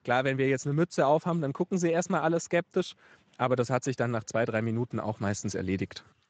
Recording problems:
garbled, watery; slightly; nothing above 7.5 kHz

